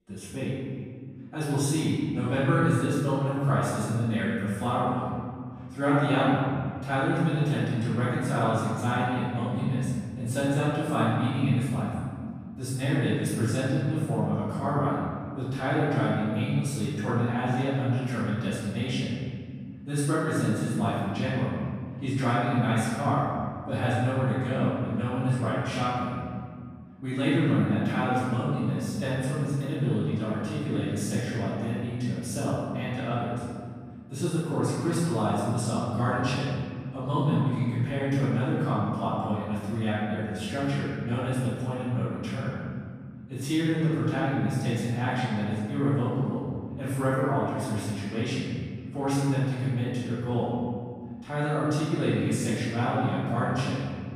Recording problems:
room echo; strong; dies away in 2.1 s
off-mic speech; far

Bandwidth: 14.5 kHz